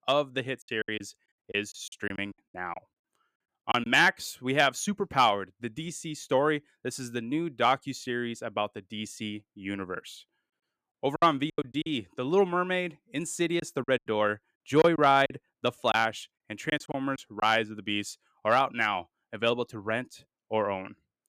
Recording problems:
choppy; very; from 0.5 to 4 s, at 11 s and from 14 to 17 s; 16% of the speech affected

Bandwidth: 14.5 kHz